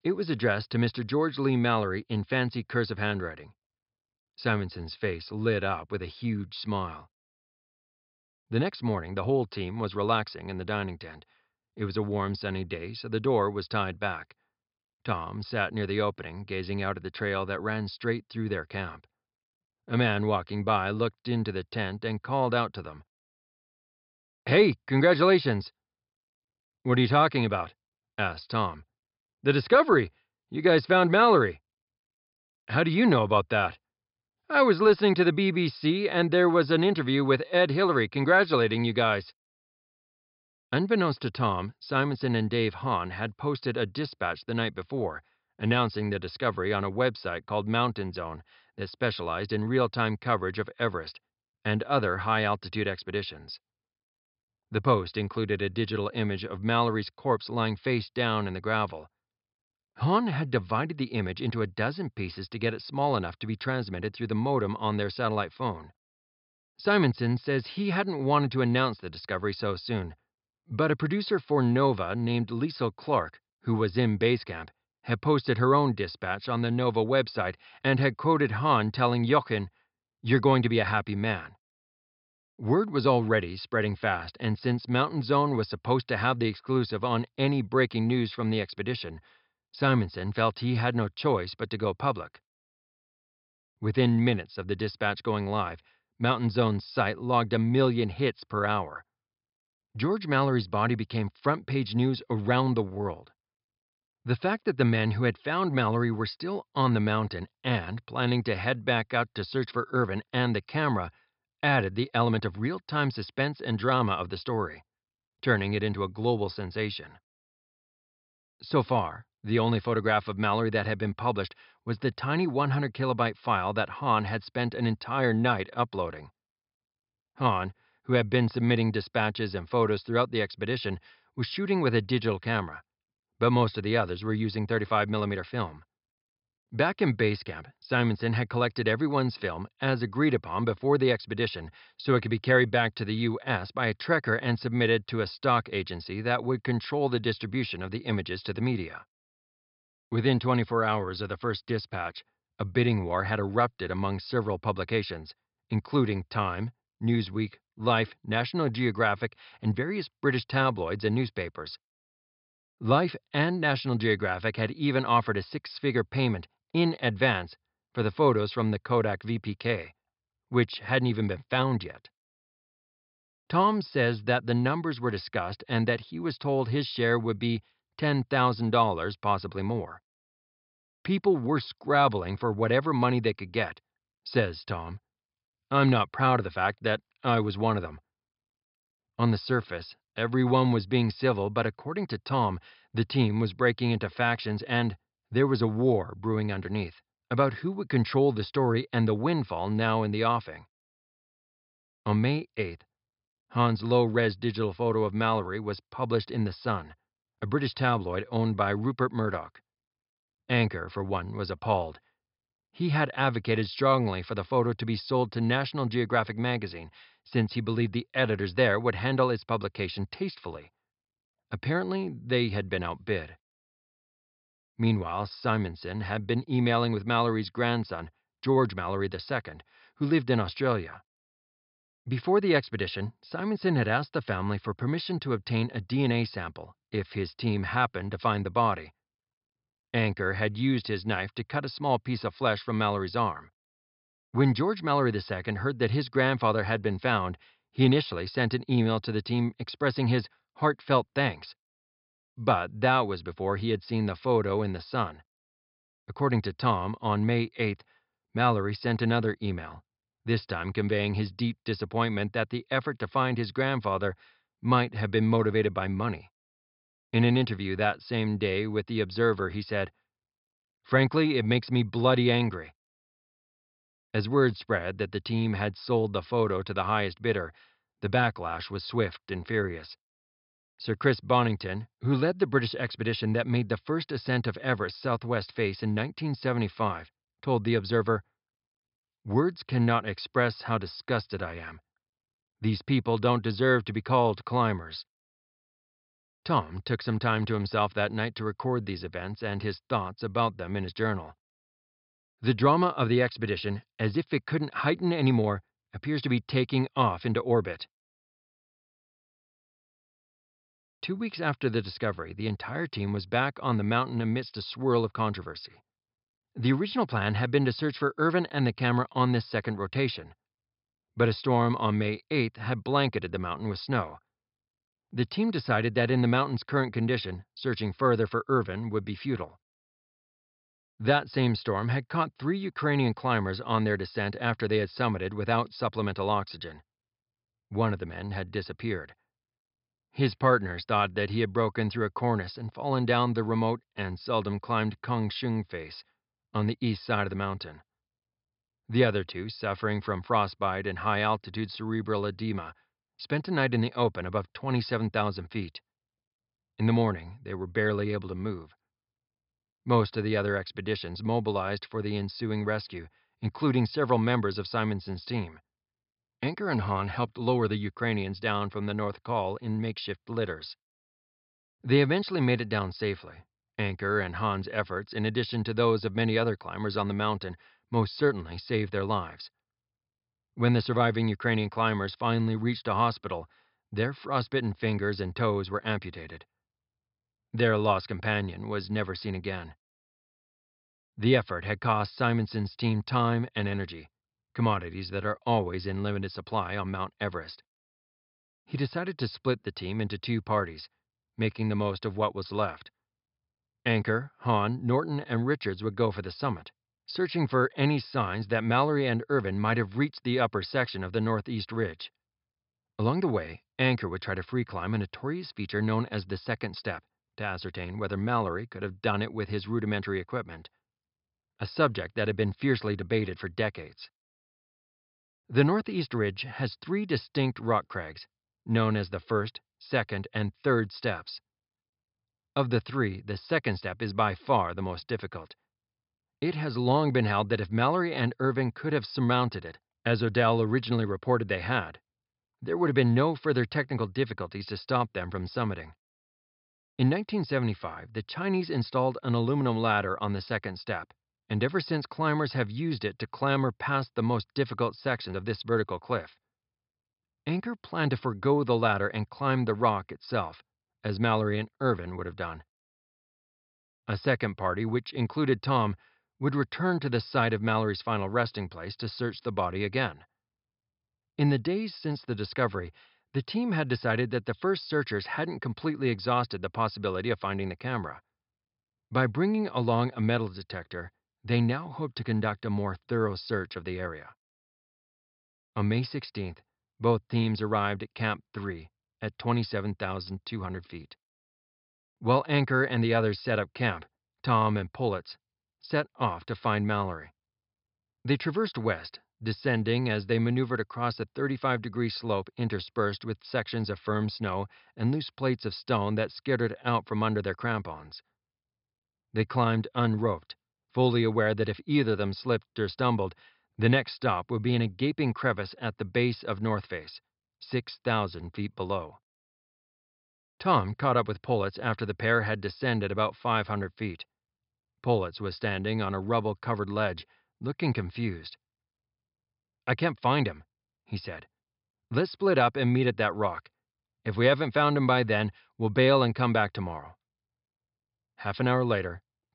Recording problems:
high frequencies cut off; noticeable; nothing above 5.5 kHz

